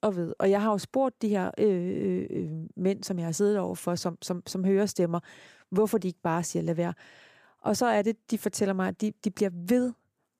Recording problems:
none

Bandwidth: 15 kHz